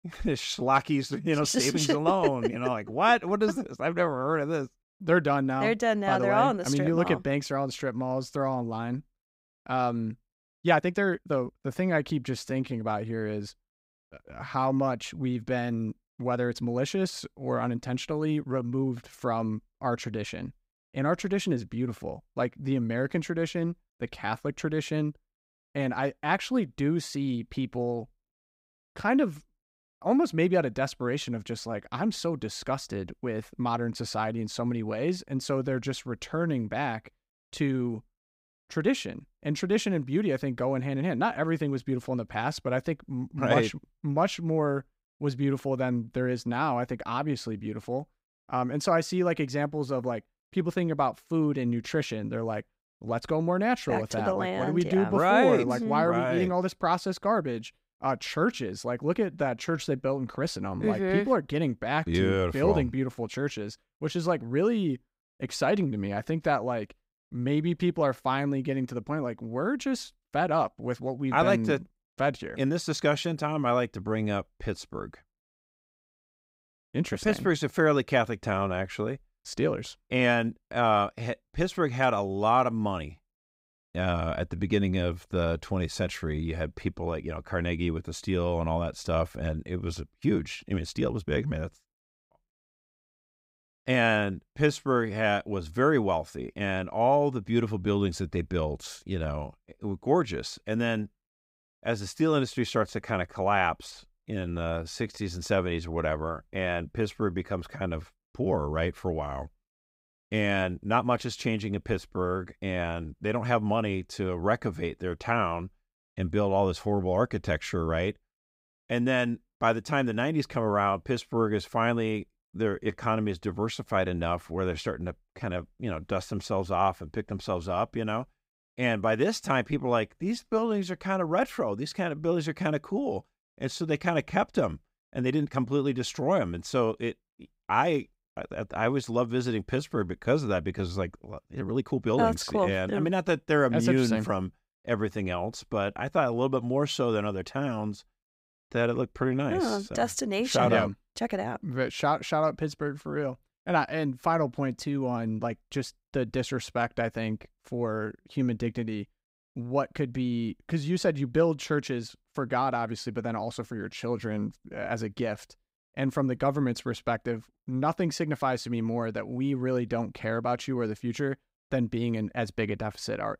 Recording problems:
uneven, jittery; strongly; from 11 s to 2:45

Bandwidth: 15.5 kHz